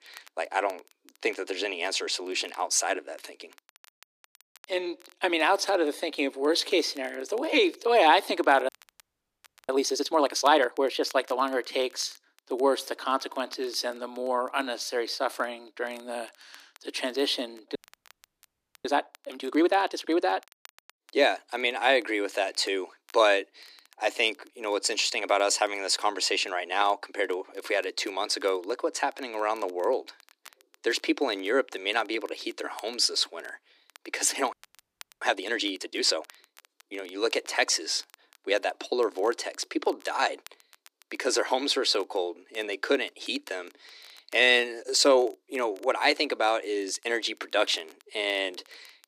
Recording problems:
thin; very; fading below 300 Hz
crackle, like an old record; faint; 30 dB below the speech
audio freezing; at 8.5 s for 1 s, at 18 s for 1 s and at 35 s for 0.5 s

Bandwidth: 14.5 kHz